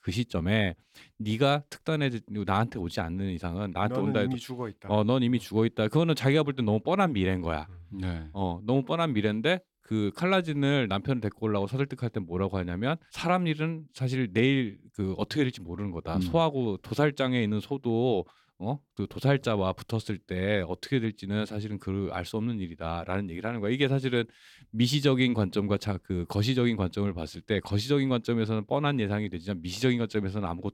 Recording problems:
none

